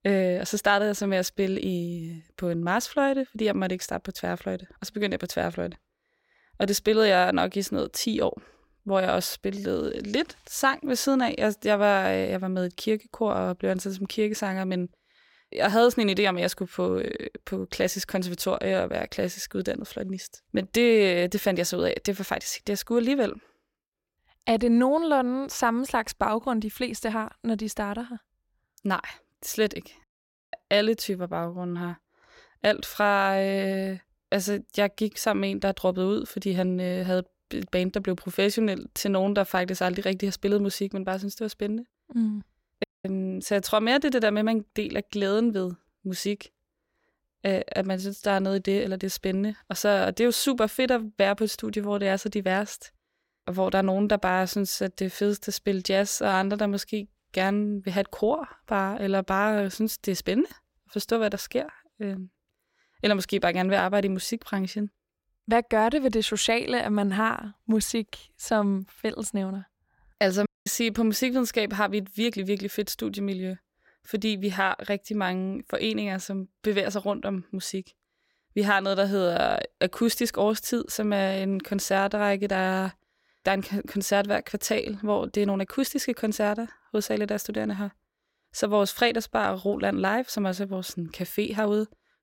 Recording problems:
audio cutting out; at 30 s, at 43 s and at 1:10

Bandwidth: 16.5 kHz